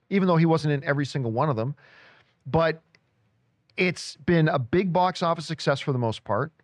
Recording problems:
muffled; slightly; fading above 2.5 kHz

